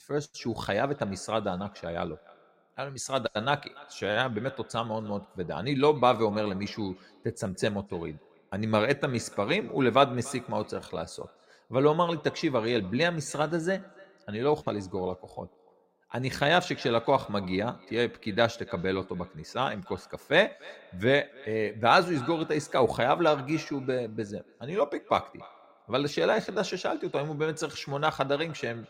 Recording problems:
echo of what is said; faint; throughout; 290 ms later, 20 dB below the speech

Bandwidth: 16 kHz